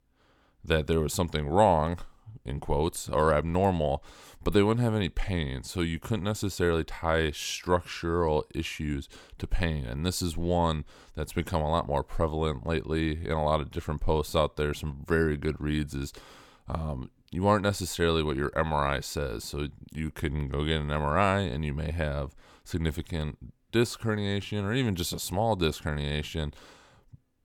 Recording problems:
none

